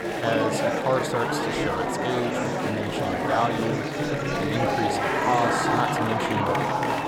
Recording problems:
murmuring crowd; very loud; throughout; 4 dB above the speech

